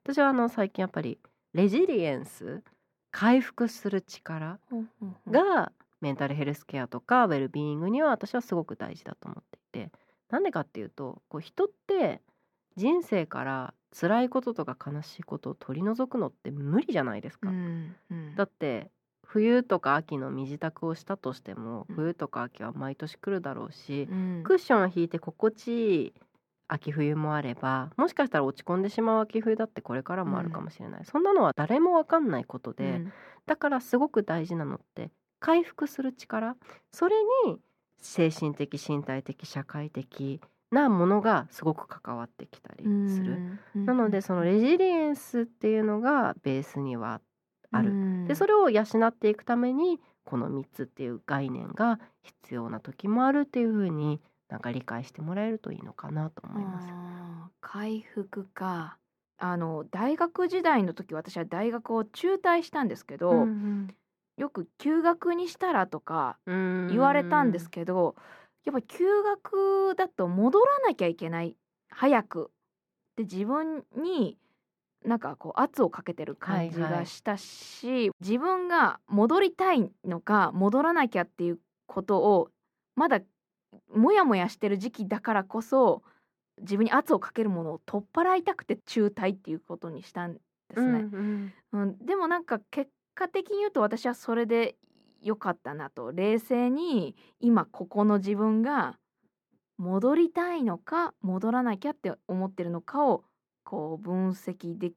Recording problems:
muffled; slightly; fading above 3 kHz

